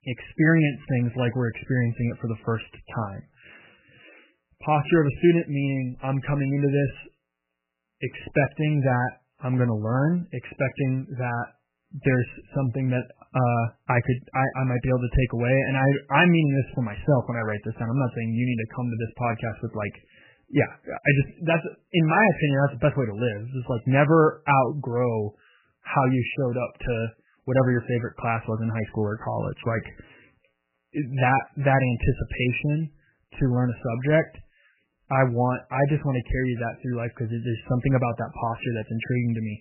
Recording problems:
garbled, watery; badly; nothing above 3 kHz

